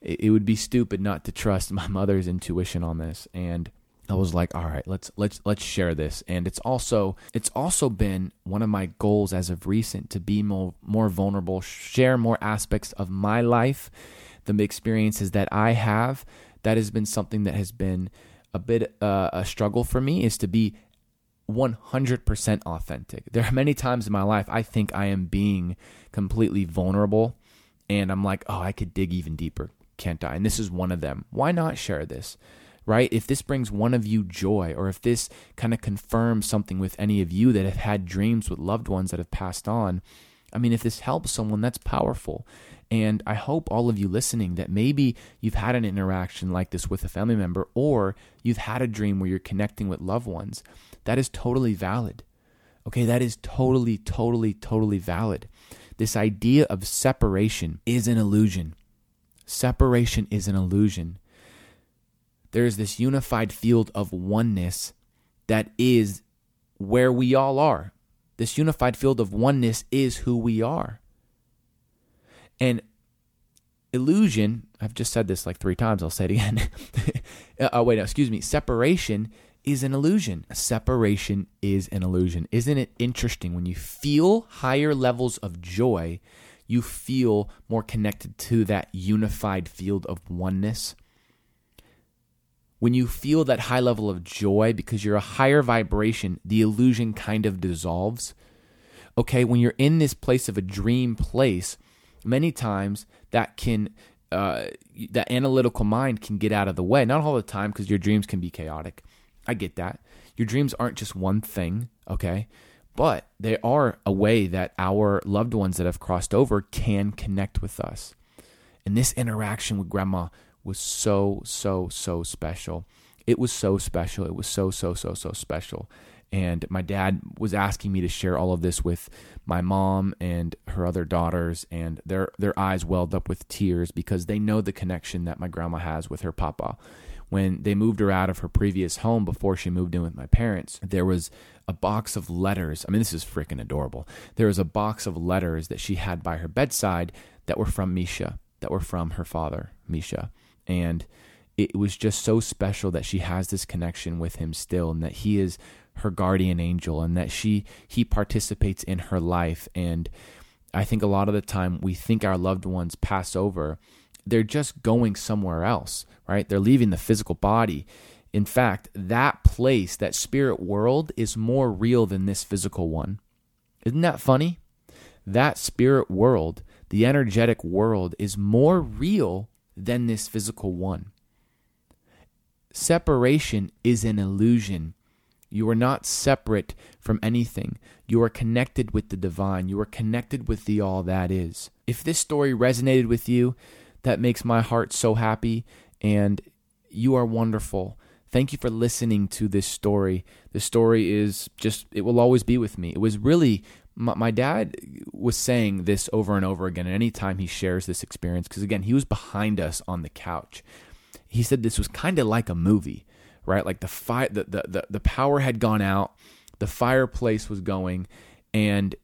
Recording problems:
none

